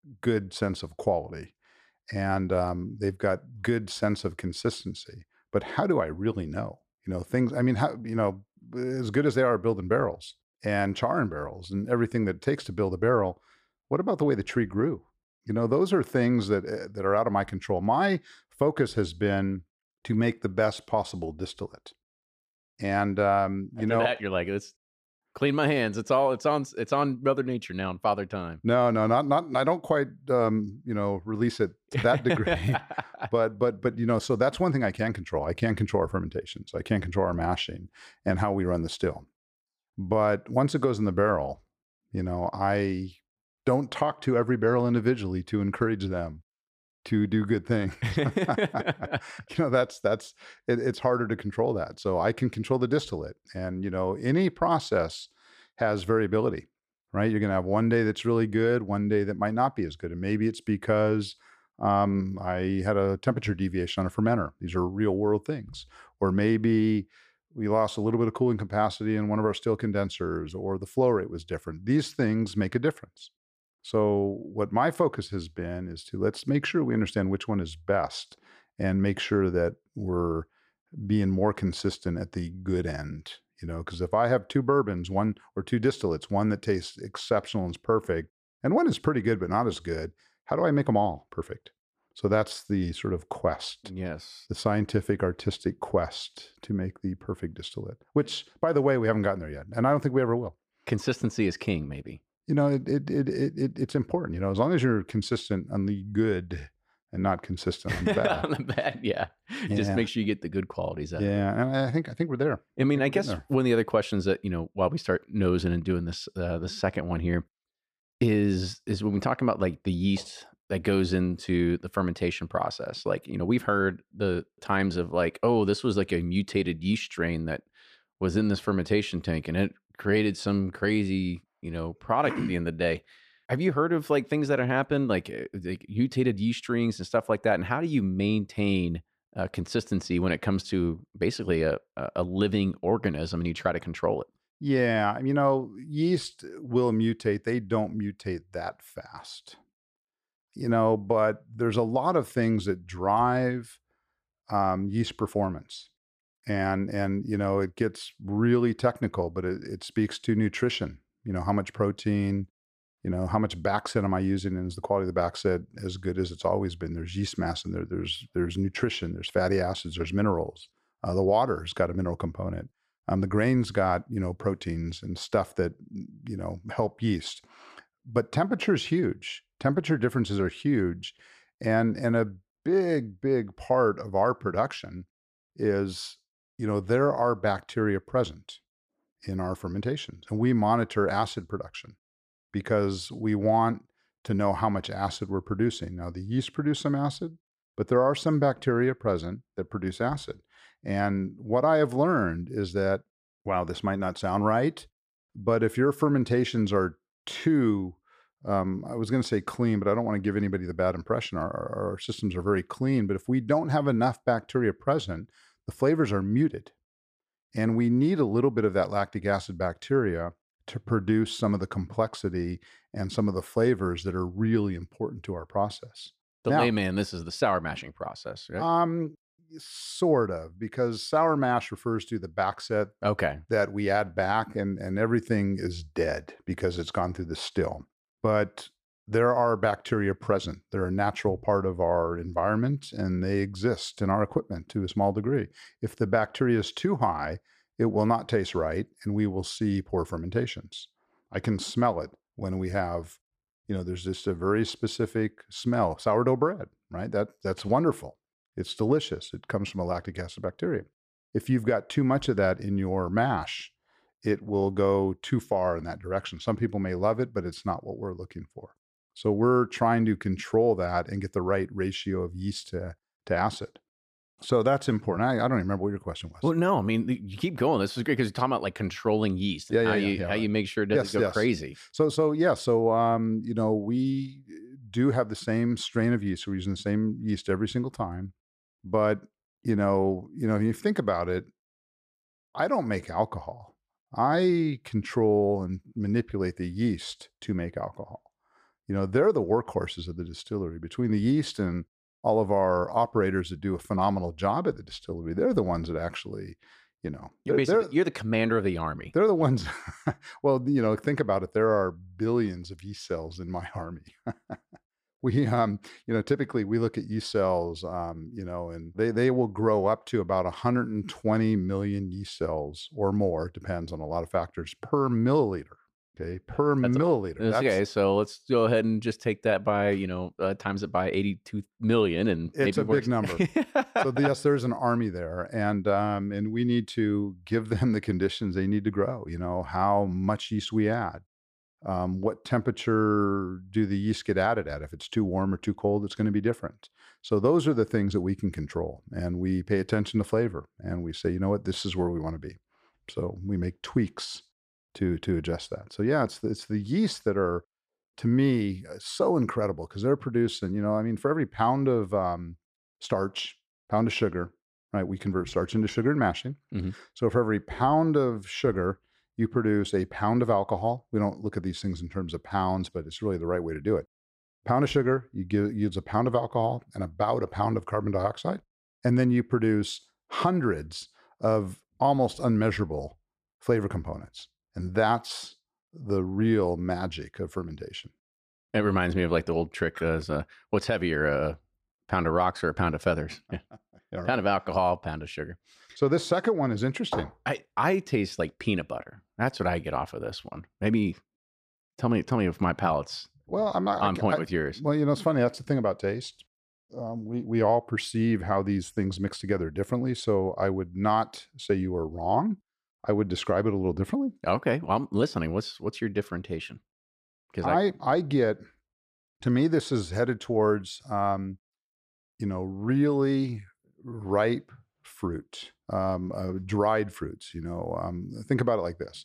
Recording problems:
none

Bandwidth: 14.5 kHz